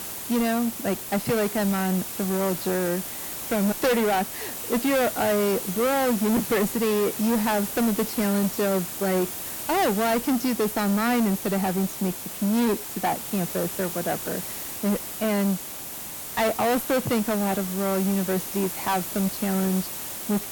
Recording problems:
distortion; heavy; 7 dB below the speech
hiss; loud; throughout; 6 dB below the speech

